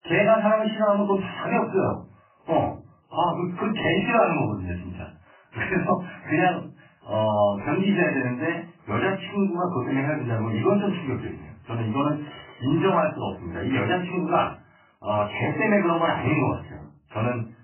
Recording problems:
off-mic speech; far
garbled, watery; badly; nothing above 3 kHz
room echo; very slight; dies away in 0.3 s

